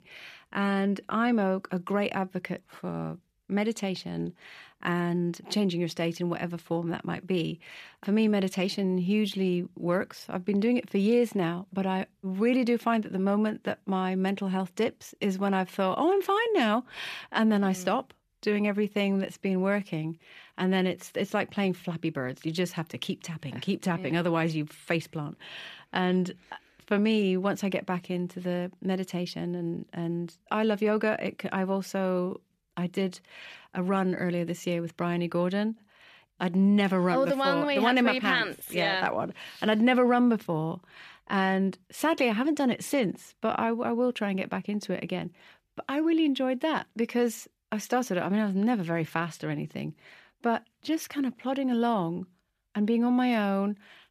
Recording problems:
none

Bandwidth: 14.5 kHz